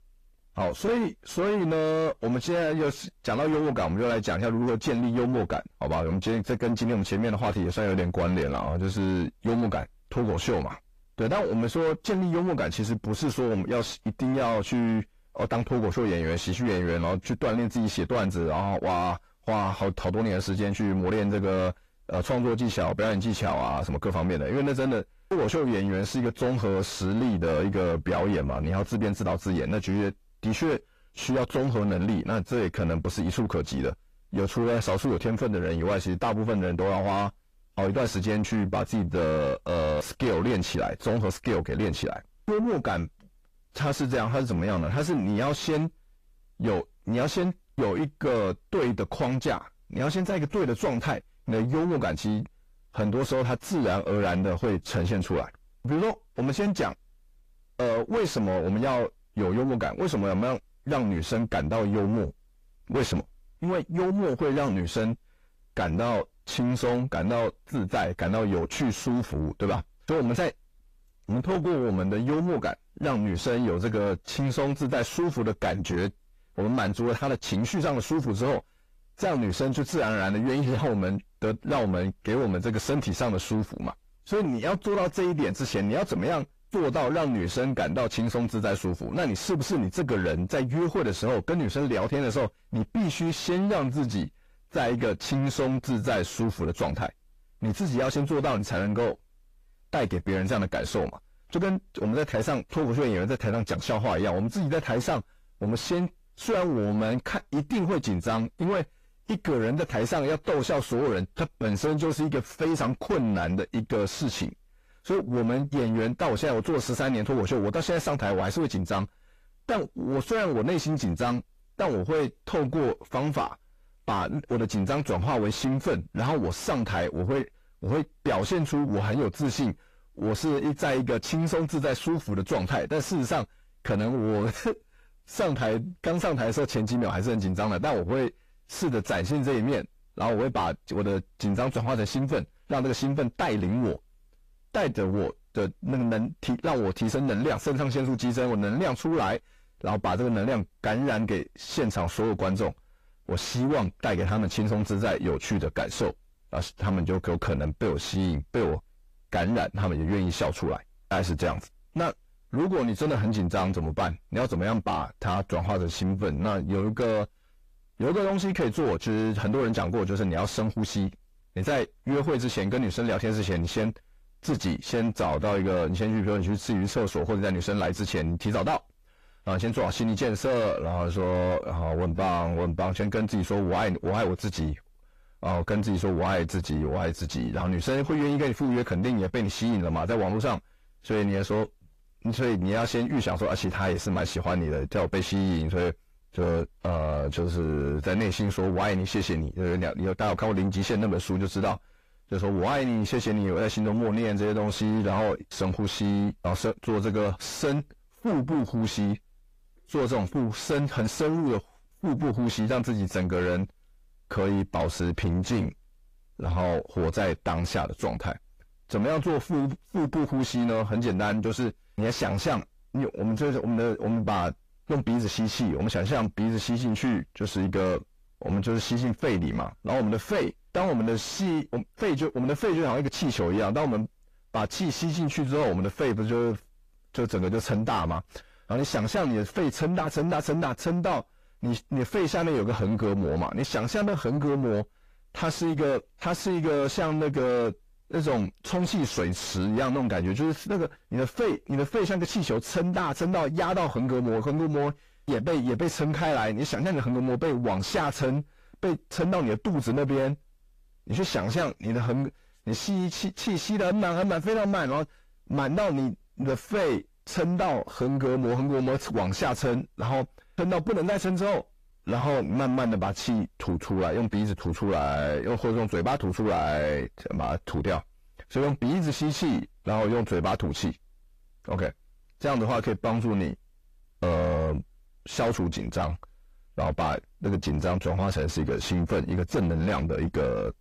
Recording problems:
distortion; heavy; 5 dB below the speech
garbled, watery; slightly; nothing above 15 kHz

